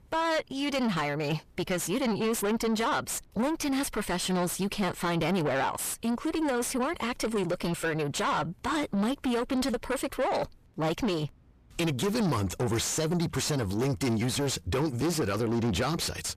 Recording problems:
distortion; heavy; 6 dB below the speech

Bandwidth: 14.5 kHz